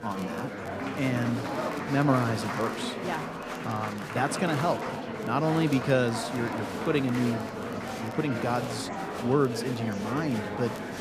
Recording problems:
murmuring crowd; loud; throughout; 4 dB below the speech
crackle, like an old record; faint; 25 dB below the speech

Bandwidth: 14.5 kHz